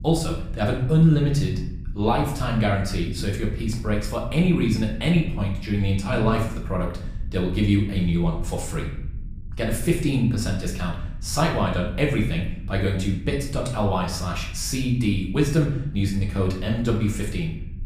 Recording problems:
off-mic speech; far
room echo; slight; dies away in 0.6 s
low rumble; faint; throughout; 25 dB below the speech

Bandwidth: 15 kHz